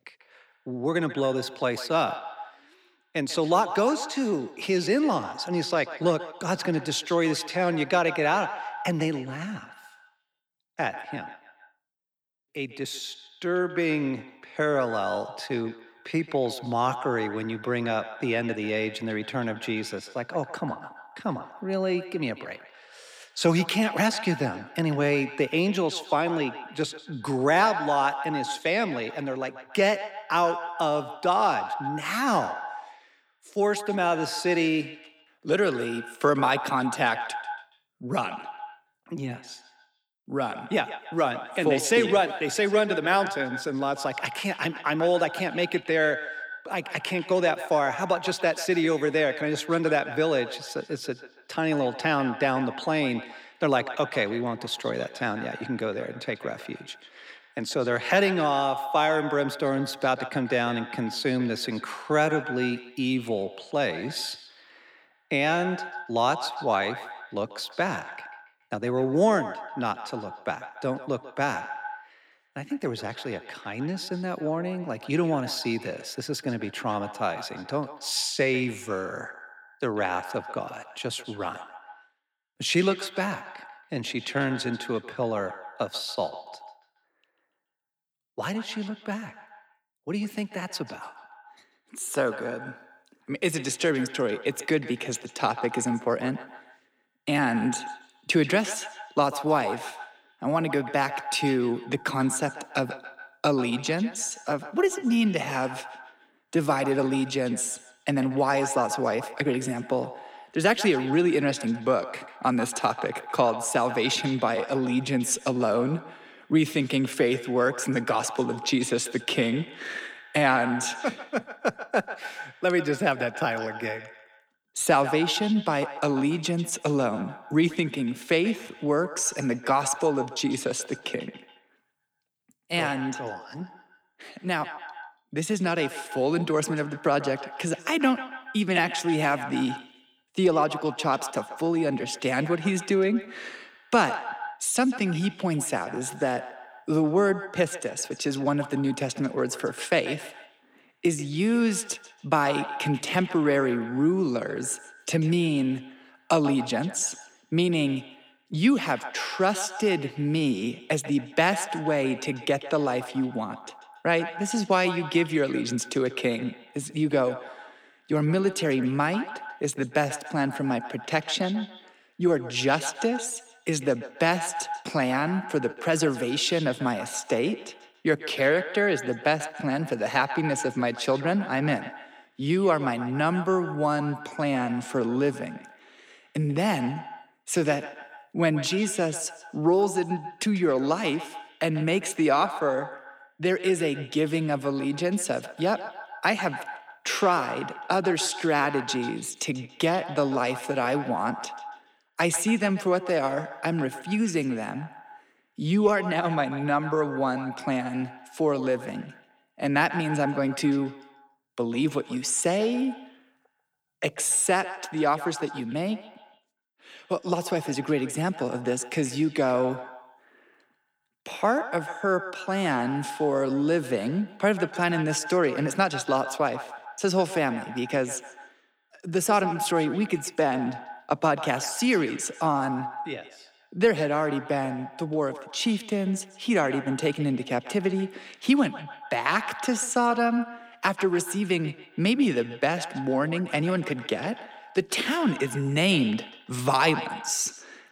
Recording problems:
echo of what is said; noticeable; throughout; 140 ms later, 10 dB below the speech

